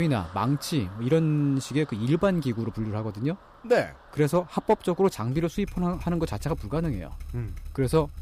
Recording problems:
traffic noise; noticeable; throughout; 20 dB below the speech
abrupt cut into speech; at the start

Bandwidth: 15 kHz